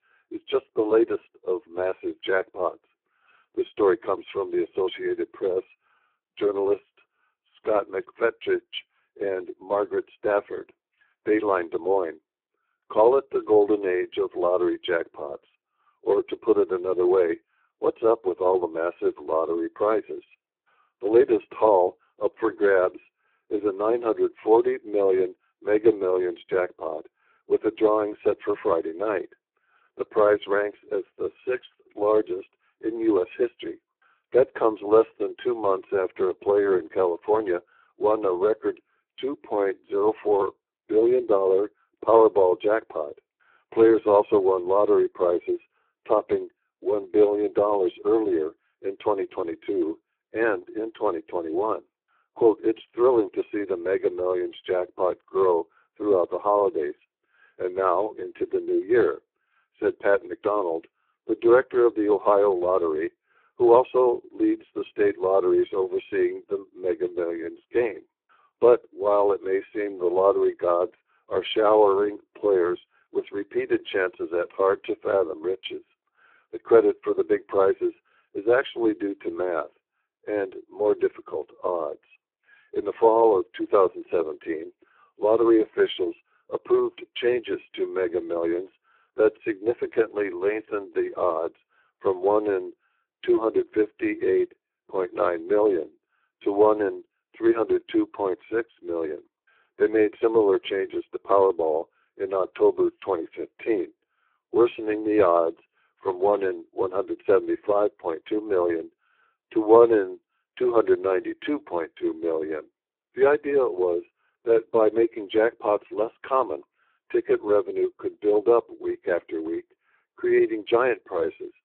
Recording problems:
phone-call audio; poor line

